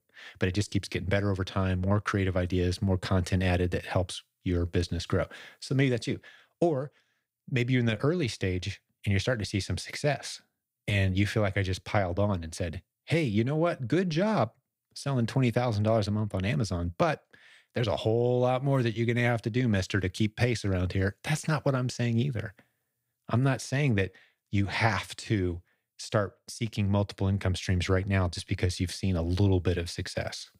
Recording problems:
none

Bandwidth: 15.5 kHz